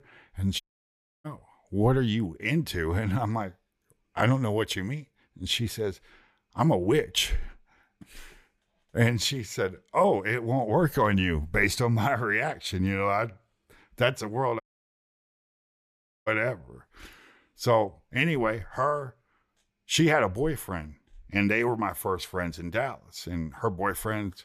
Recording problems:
audio cutting out; at 0.5 s for 0.5 s and at 15 s for 1.5 s

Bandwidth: 14.5 kHz